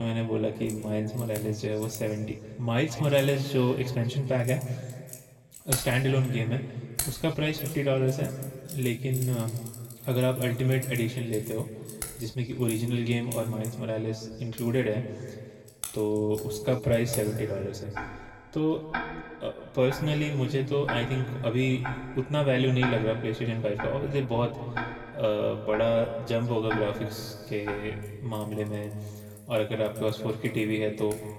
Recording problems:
room echo; slight; dies away in 1.8 s
off-mic speech; somewhat distant
household noises; noticeable; throughout; 10 dB below the speech
abrupt cut into speech; at the start

